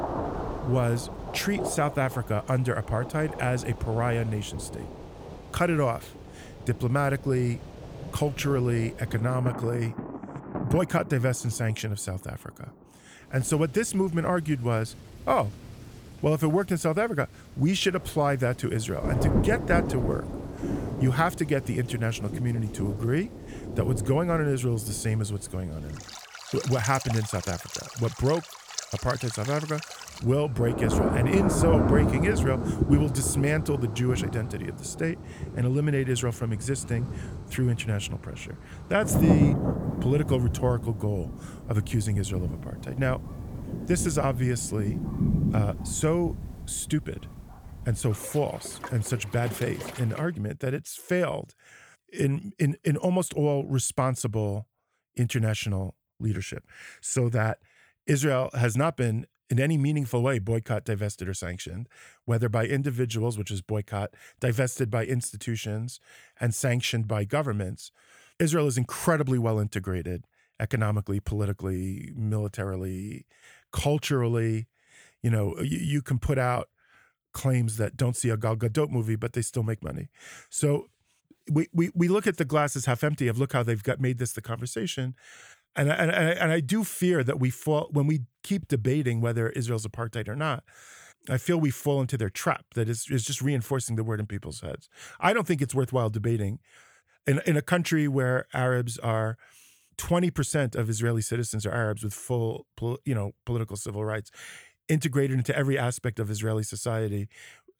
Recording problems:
rain or running water; loud; until 50 s; 5 dB below the speech

